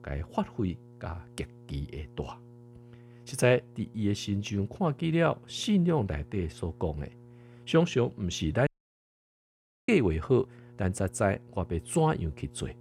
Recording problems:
electrical hum; faint; throughout; 60 Hz, 25 dB below the speech
audio cutting out; at 8.5 s for 1 s

